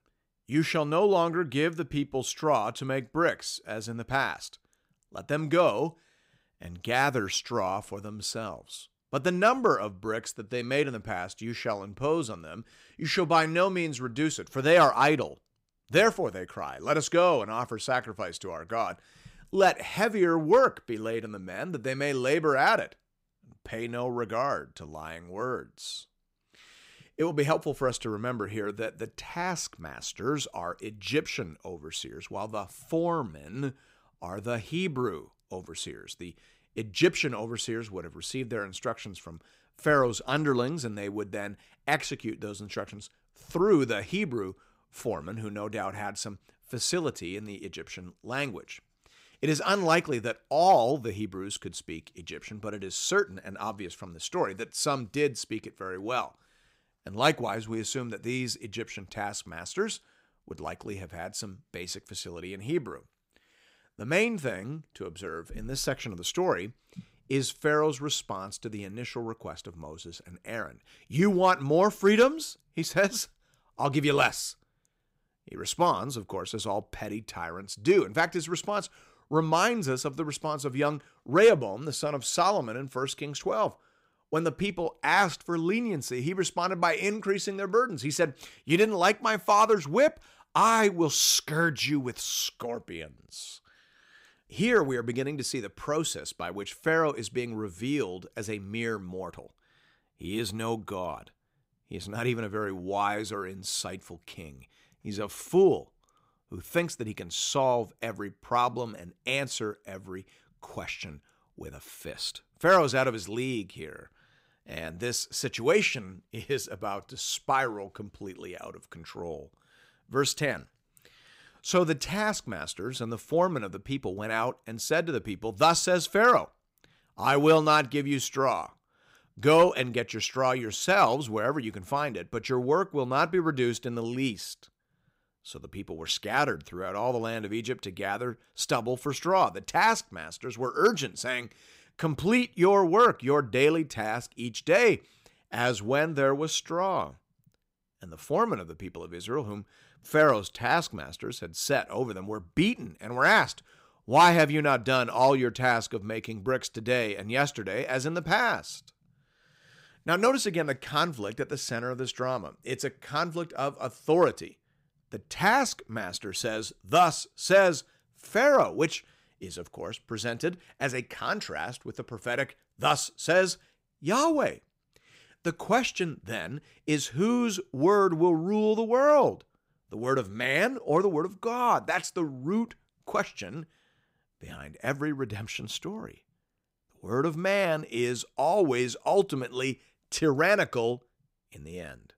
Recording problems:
none

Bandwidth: 15.5 kHz